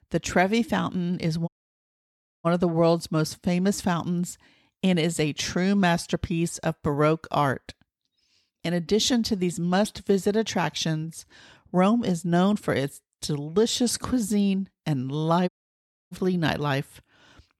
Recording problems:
audio cutting out; at 1.5 s for 1 s and at 15 s for 0.5 s

